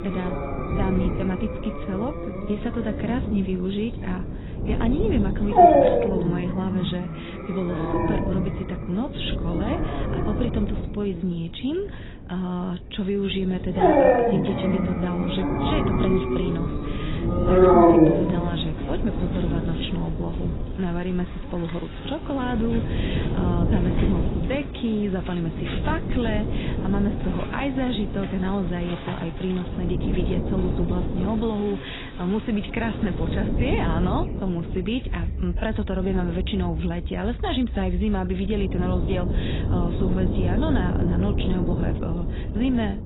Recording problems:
garbled, watery; badly; nothing above 4 kHz
animal sounds; very loud; throughout; 3 dB above the speech
wind noise on the microphone; heavy; 5 dB below the speech

